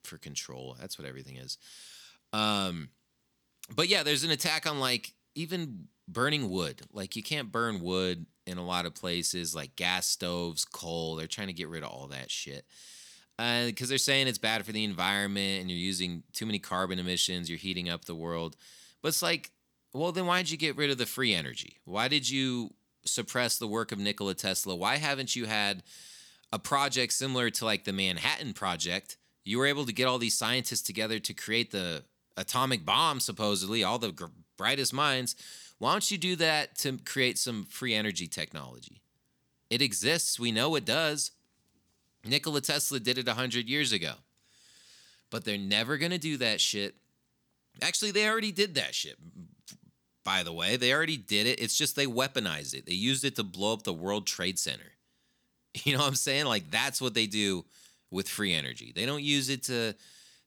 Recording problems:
none

